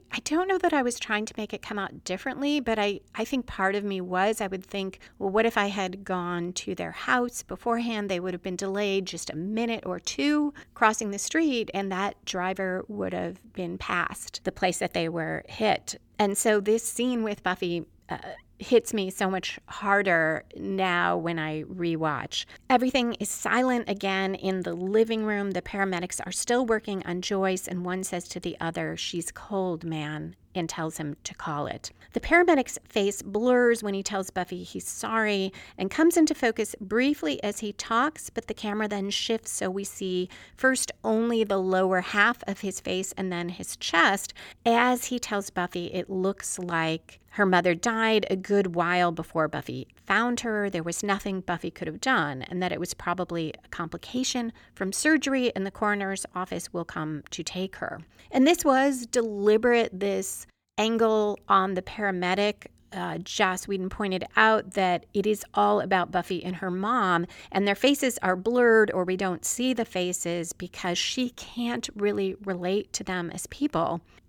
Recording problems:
none

